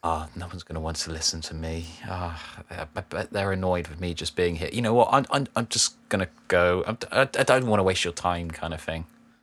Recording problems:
none

